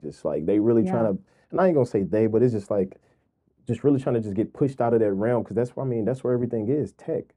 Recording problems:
muffled; very; fading above 1.5 kHz

